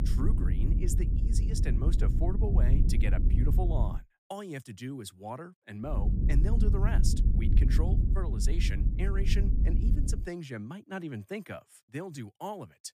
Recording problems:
low rumble; loud; until 4 s and from 6 to 10 s; 3 dB below the speech

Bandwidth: 15 kHz